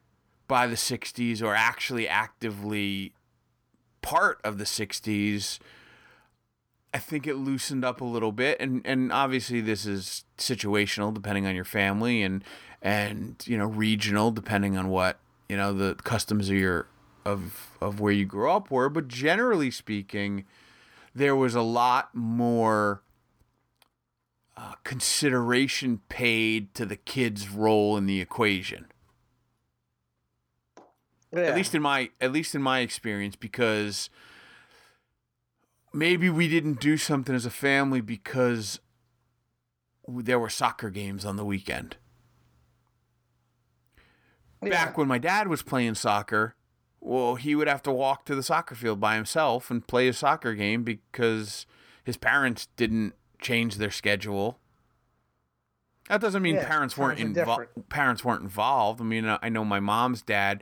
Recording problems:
none

